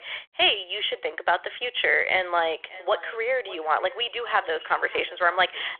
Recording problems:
thin; very; fading below 800 Hz
echo of what is said; faint; from 2.5 s on; 590 ms later, 20 dB below the speech
phone-call audio; nothing above 3.5 kHz

